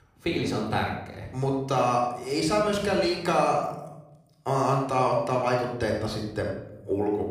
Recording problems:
room echo; noticeable; dies away in 0.7 s
off-mic speech; somewhat distant

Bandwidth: 15 kHz